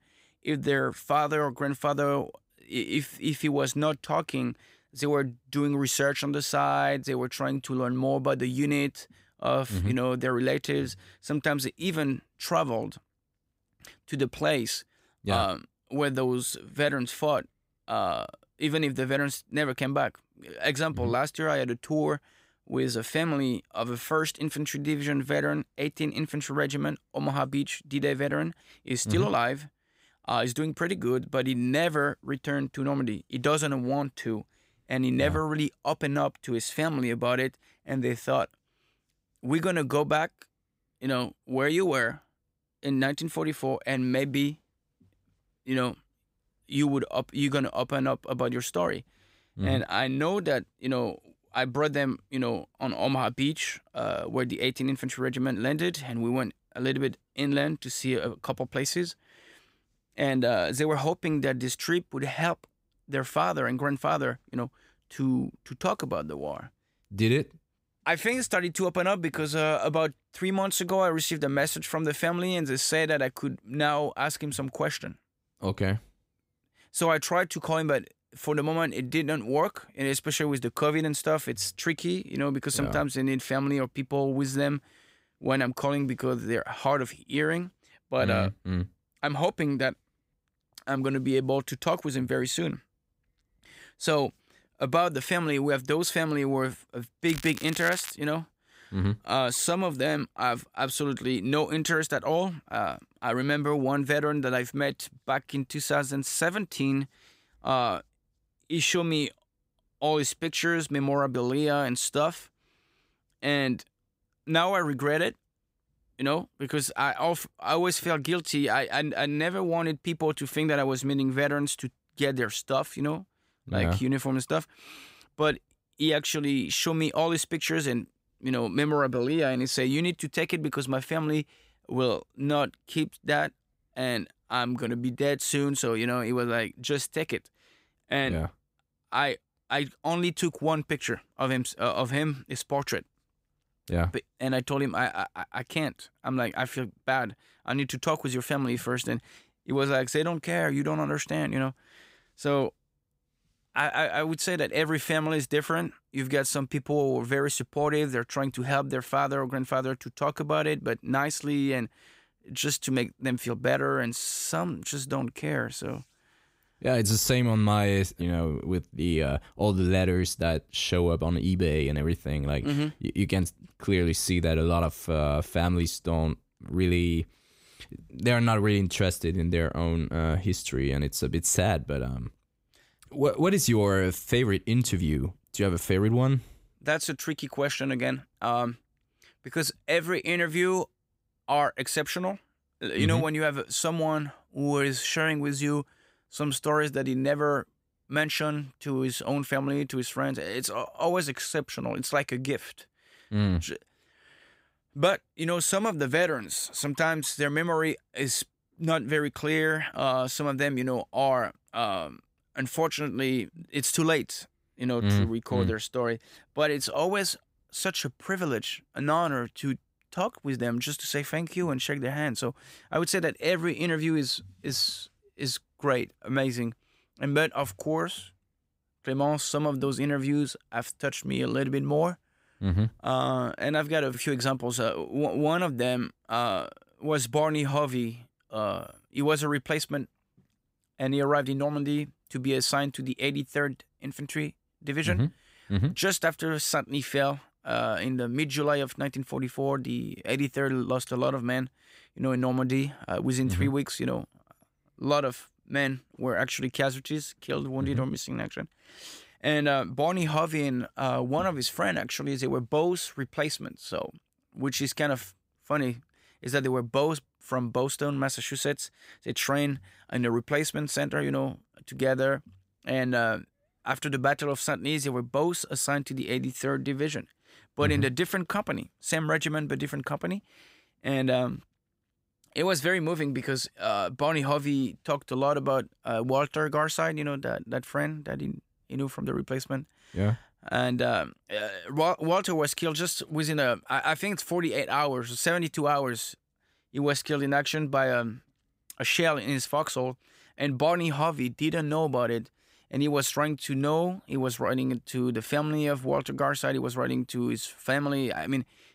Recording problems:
crackling; noticeable; at 1:37; 10 dB below the speech

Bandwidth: 15.5 kHz